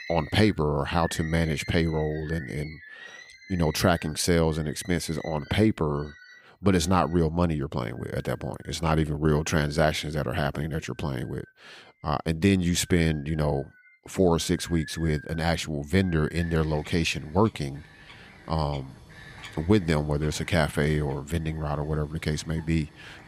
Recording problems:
animal sounds; noticeable; throughout; 20 dB below the speech

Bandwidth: 15 kHz